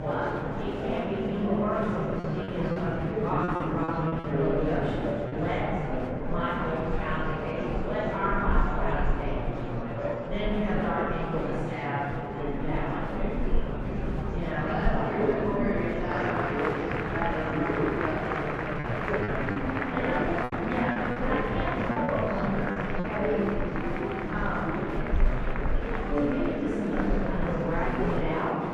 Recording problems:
room echo; strong; dies away in 2.4 s
off-mic speech; far
muffled; very; fading above 3.5 kHz
murmuring crowd; loud; throughout; as loud as the speech
low rumble; noticeable; throughout; 20 dB below the speech
choppy; very; from 2 to 5.5 s and from 19 to 23 s; 9% of the speech affected

